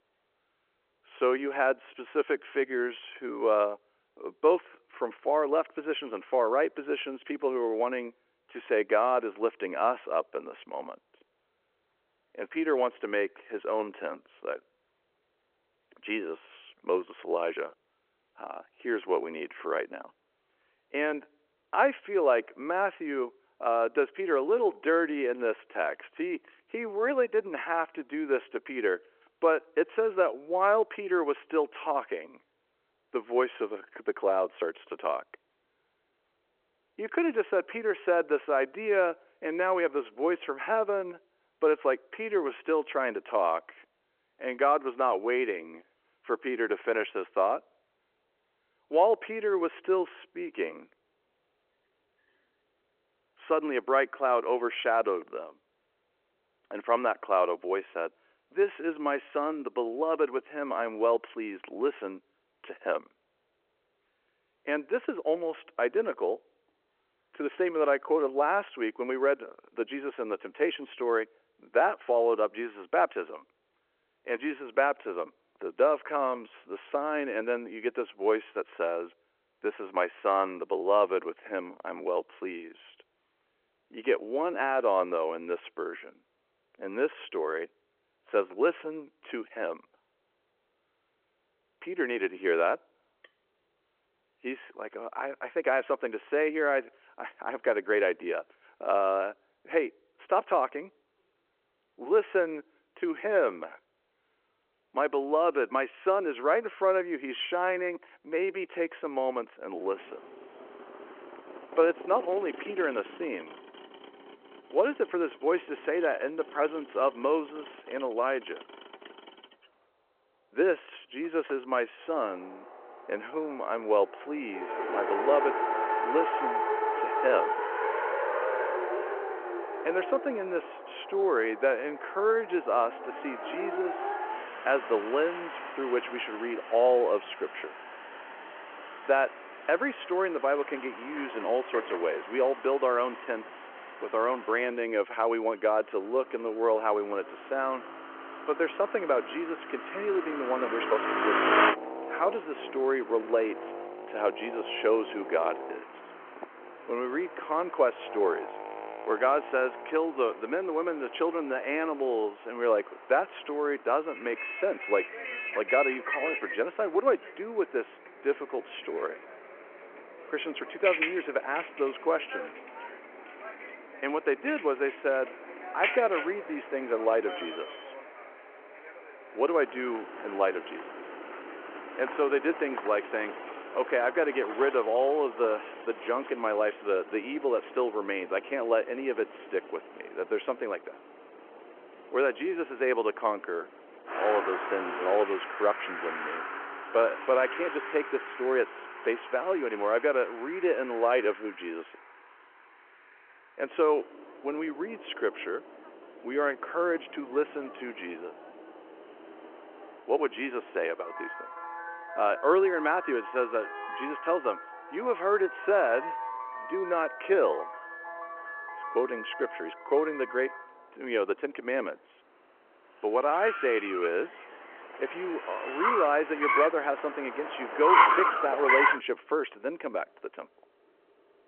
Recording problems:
phone-call audio
traffic noise; loud; from 1:50 on; 6 dB below the speech

